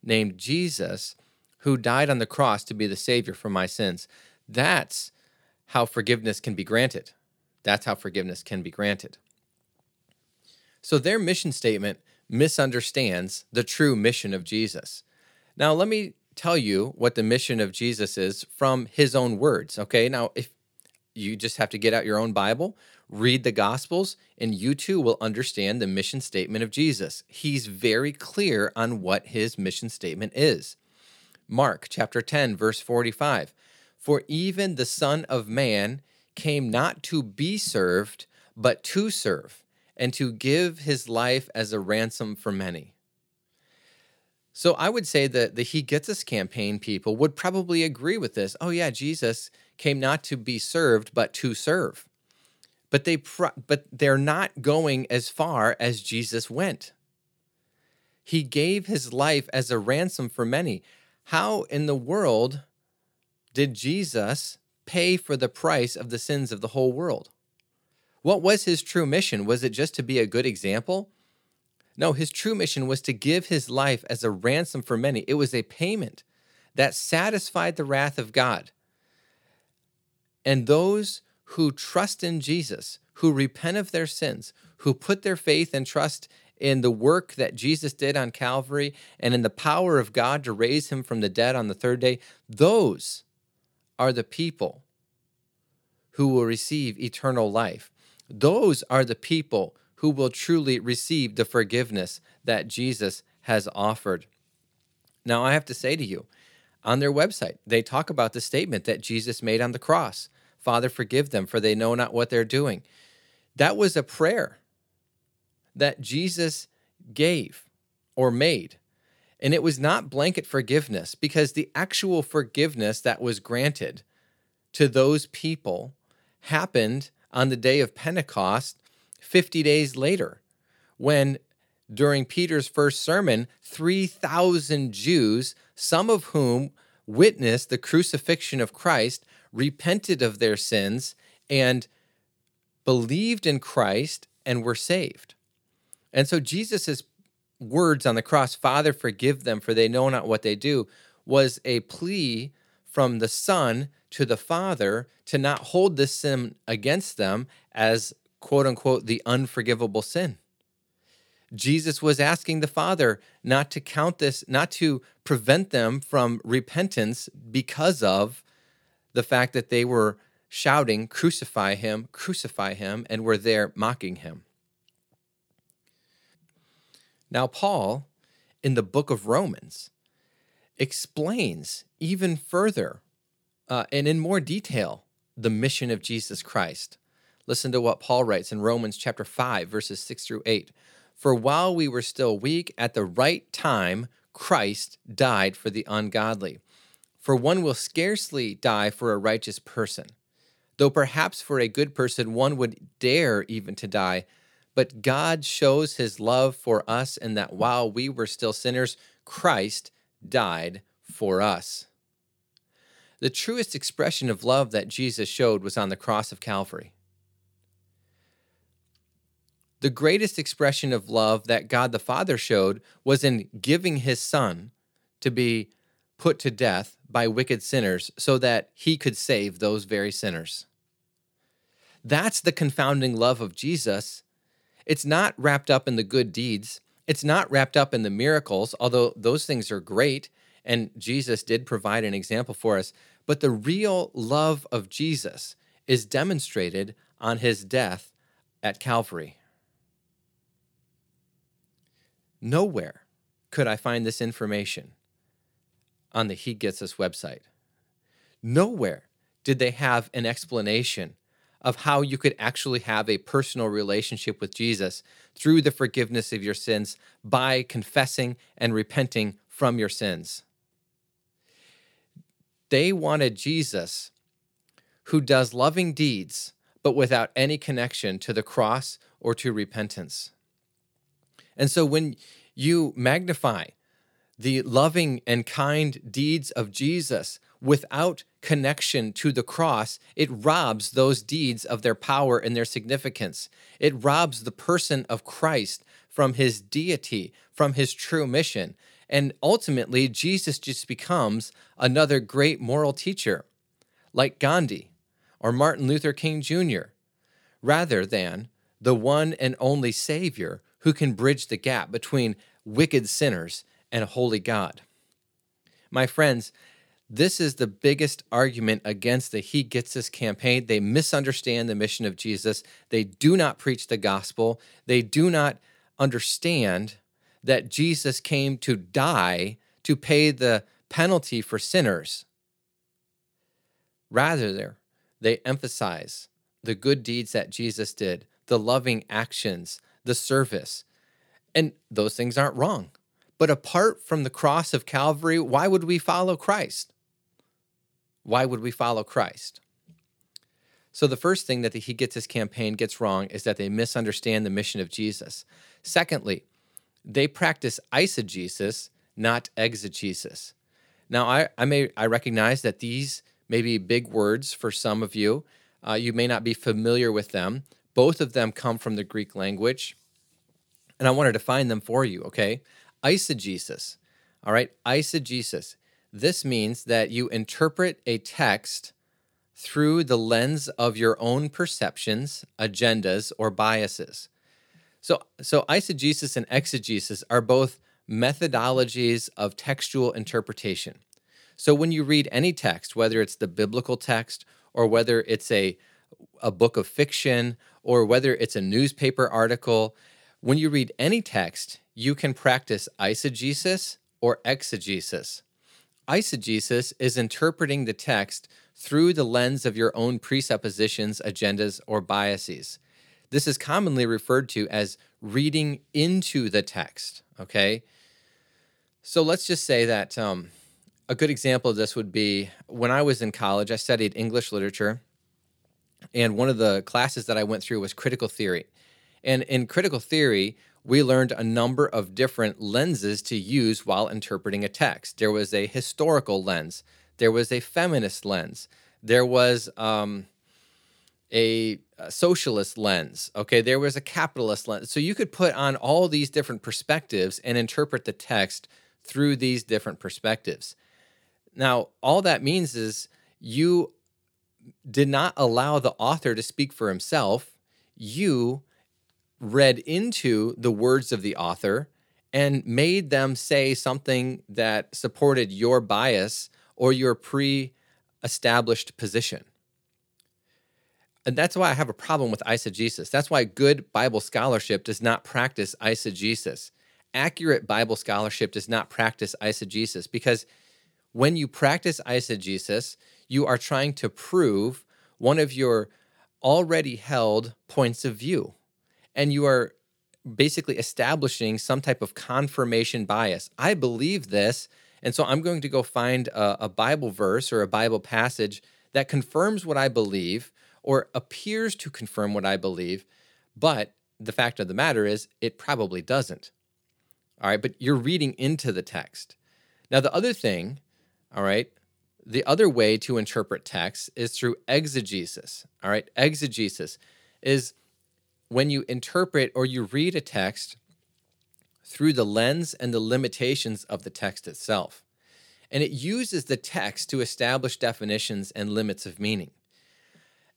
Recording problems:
none

